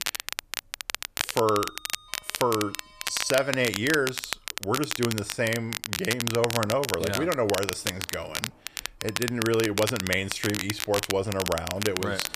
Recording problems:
crackle, like an old record; loud; 4 dB below the speech
household noises; faint; throughout; 25 dB below the speech

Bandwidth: 14.5 kHz